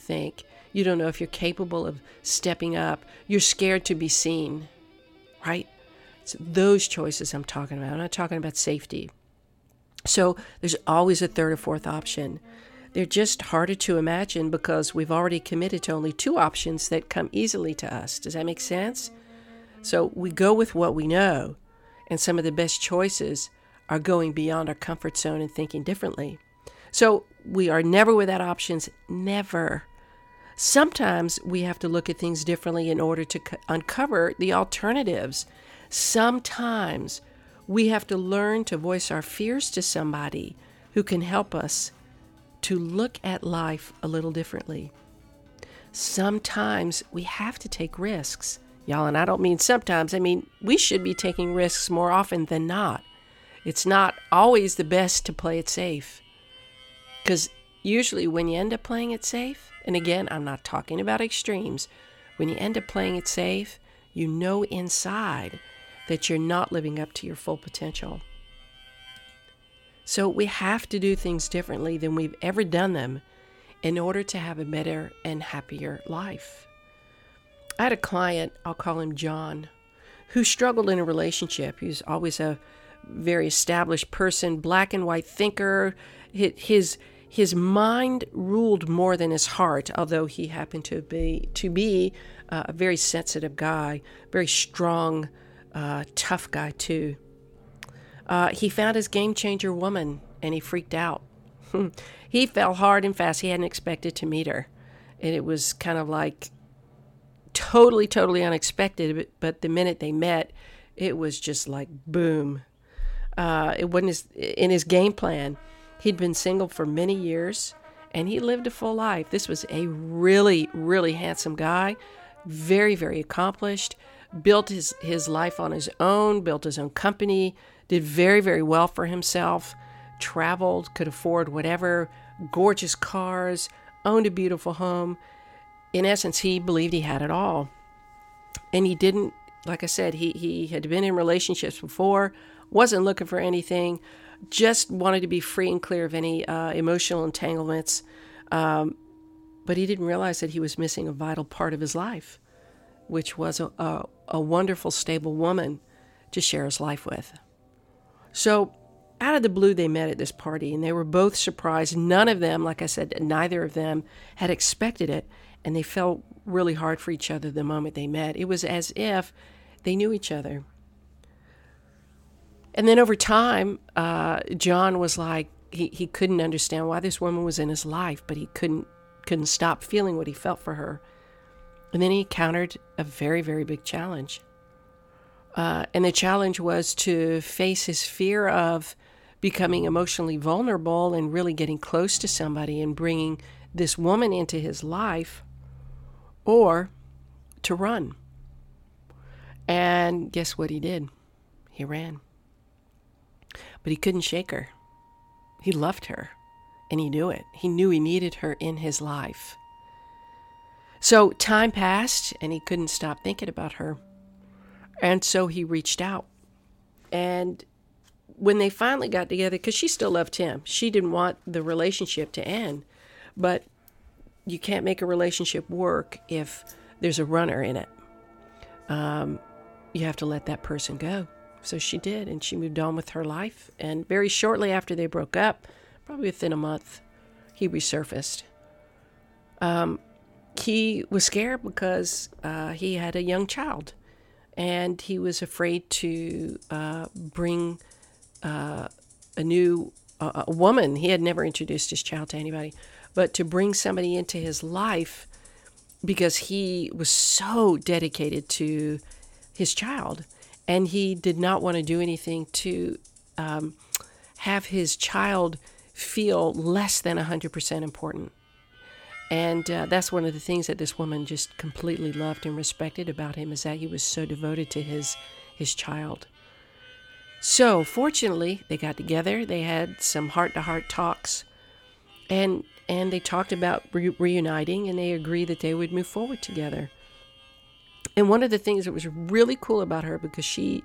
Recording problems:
background music; faint; throughout; 25 dB below the speech

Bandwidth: 17.5 kHz